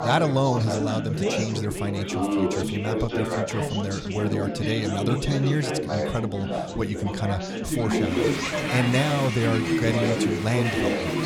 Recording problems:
chatter from many people; very loud; throughout; as loud as the speech

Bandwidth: 18.5 kHz